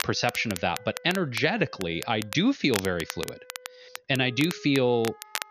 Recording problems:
high frequencies cut off; noticeable; nothing above 6.5 kHz
crackle, like an old record; noticeable; 10 dB below the speech
background music; faint; throughout; 25 dB below the speech

